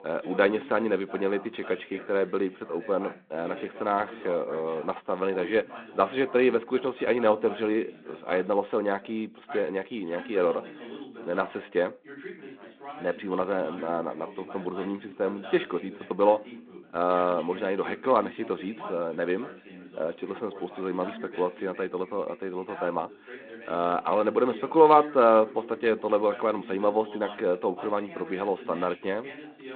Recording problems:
phone-call audio; nothing above 3.5 kHz
background chatter; noticeable; throughout; 2 voices, 15 dB below the speech

